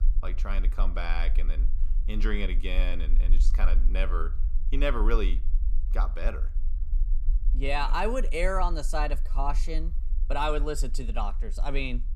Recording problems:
low rumble; faint; throughout; 25 dB below the speech

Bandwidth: 14.5 kHz